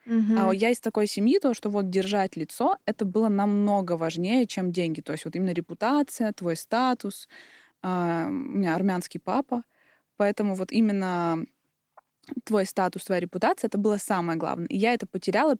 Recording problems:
garbled, watery; slightly

